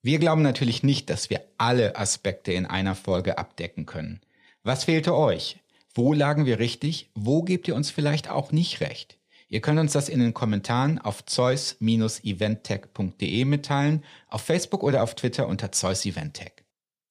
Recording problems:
none

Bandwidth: 14.5 kHz